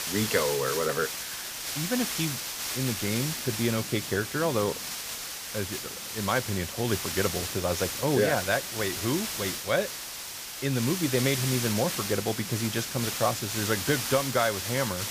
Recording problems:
hiss; loud; throughout; 3 dB below the speech

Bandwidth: 15 kHz